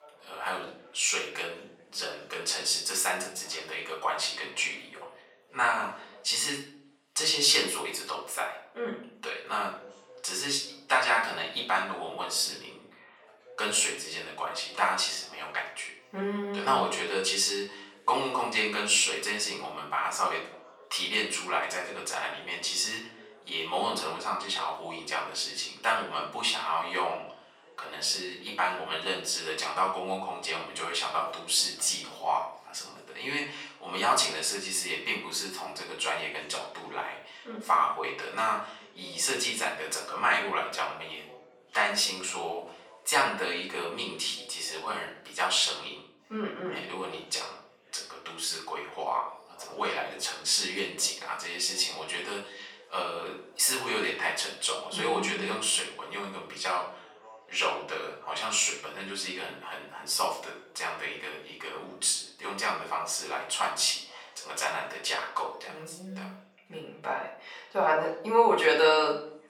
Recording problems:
off-mic speech; far
thin; very; fading below 750 Hz
room echo; slight; dies away in 0.5 s
background chatter; faint; throughout; 4 voices, 25 dB below the speech

